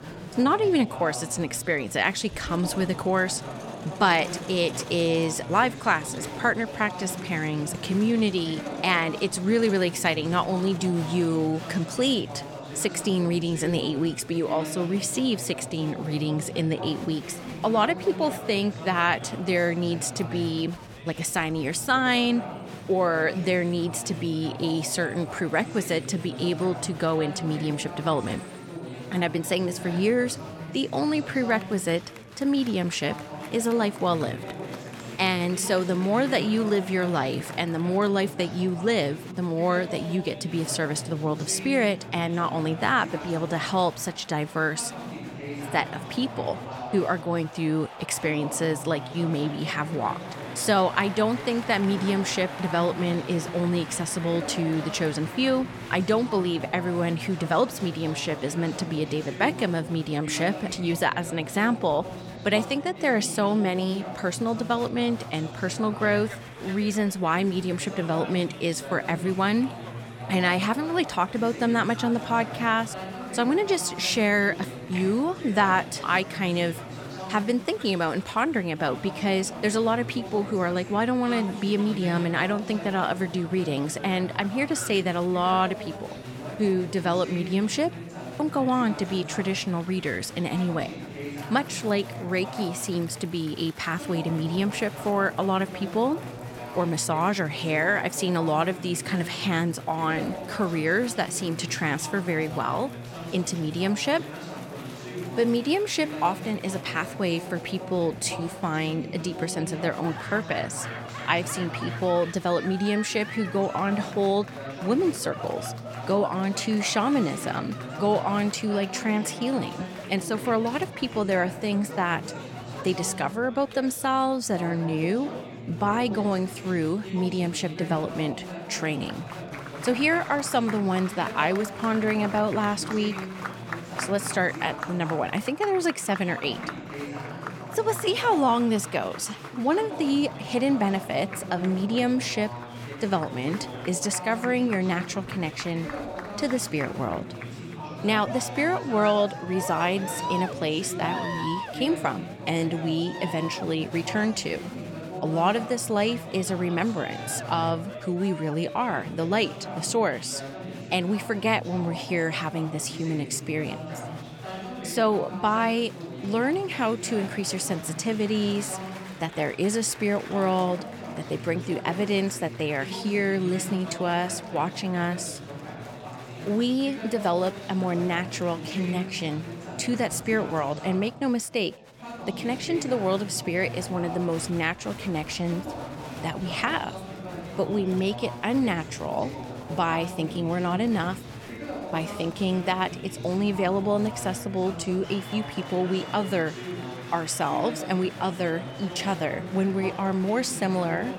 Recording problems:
chatter from many people; noticeable; throughout; 10 dB below the speech

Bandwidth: 17 kHz